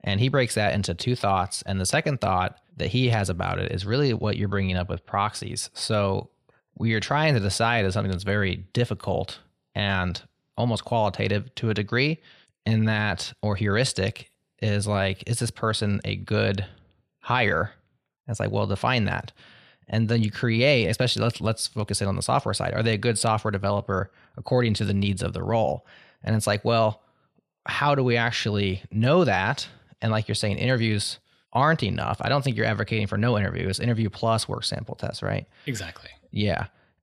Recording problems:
none

